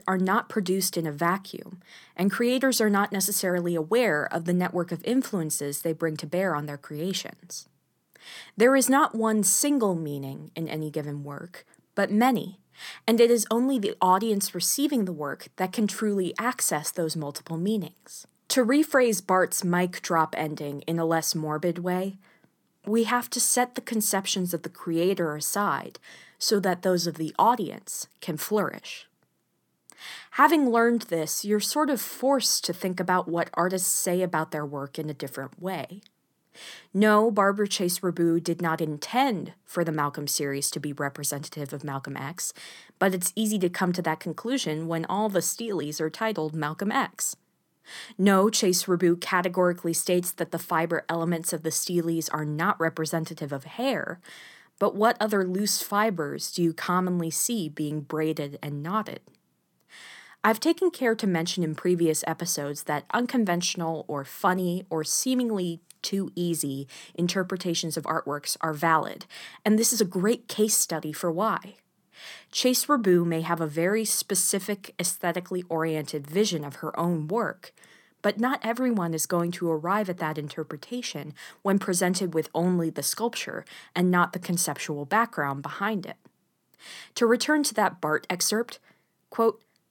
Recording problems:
none

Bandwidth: 17.5 kHz